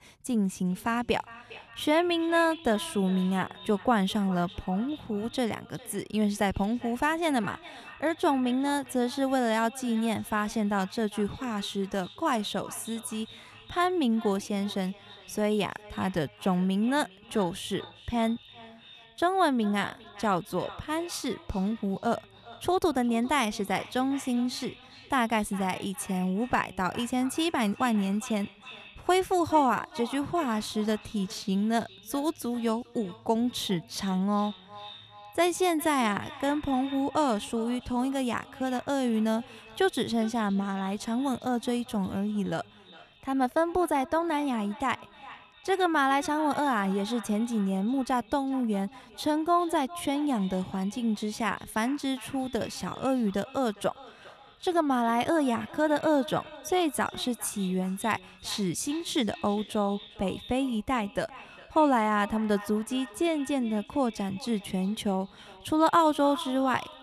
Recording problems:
echo of what is said; faint; throughout; 400 ms later, 20 dB below the speech

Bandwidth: 13.5 kHz